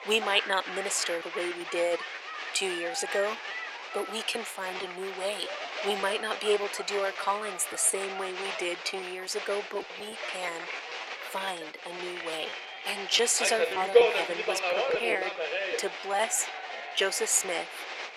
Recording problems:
thin; very; fading below 400 Hz
crowd noise; loud; throughout; 3 dB below the speech
choppy; very; 6% of the speech affected

